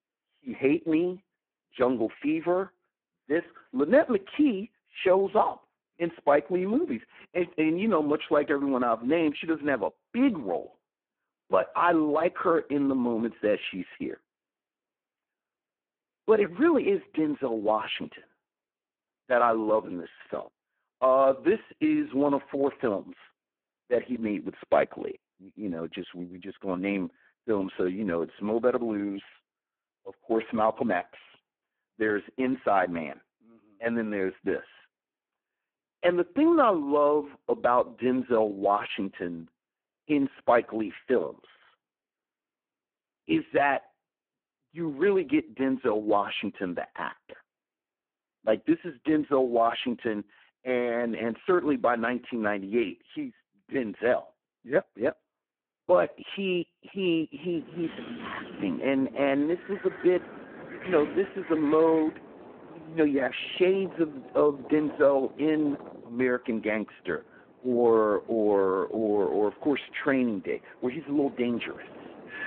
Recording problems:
phone-call audio; poor line
wind in the background; noticeable; from 58 s on; 15 dB below the speech

